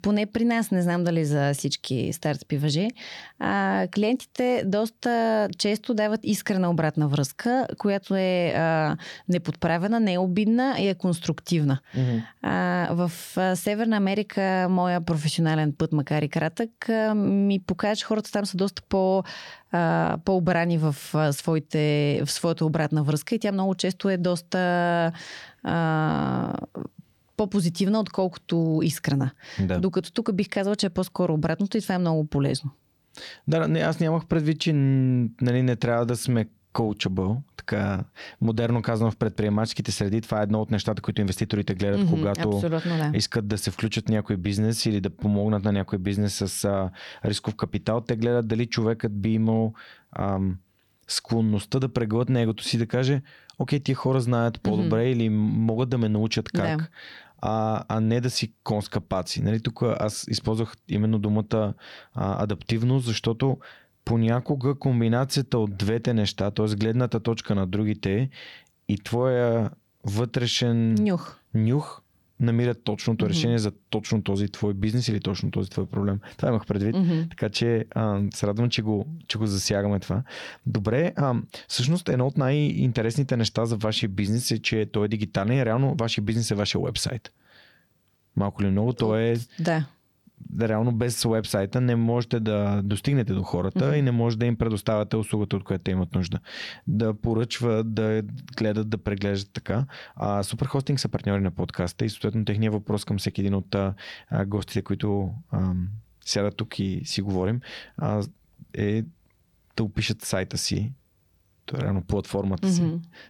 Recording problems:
squashed, flat; somewhat

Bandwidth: 17.5 kHz